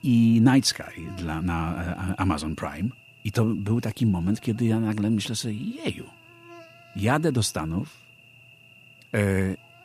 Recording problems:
electrical hum; faint; throughout; 60 Hz, 20 dB below the speech

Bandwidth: 15 kHz